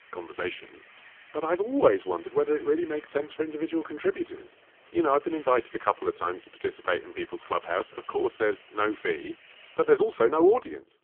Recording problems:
phone-call audio; poor line
traffic noise; faint; throughout; 25 dB below the speech

